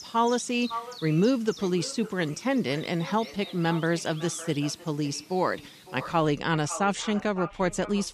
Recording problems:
echo of what is said; noticeable; throughout; 560 ms later, 15 dB below the speech
animal sounds; noticeable; throughout; 20 dB below the speech

